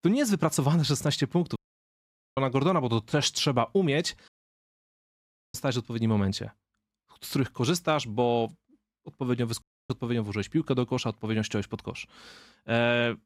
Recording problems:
audio cutting out; at 1.5 s for 1 s, at 4.5 s for 1.5 s and at 9.5 s

